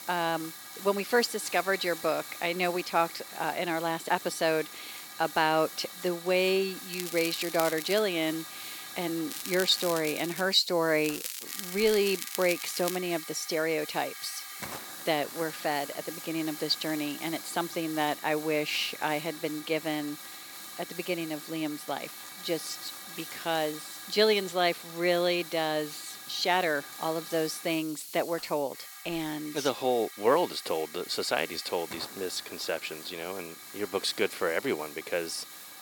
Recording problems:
thin; somewhat; fading below 400 Hz
crackling; loud; from 7 to 8 s, from 9.5 to 10 s and from 11 to 13 s; 8 dB below the speech
hiss; noticeable; throughout; 10 dB below the speech

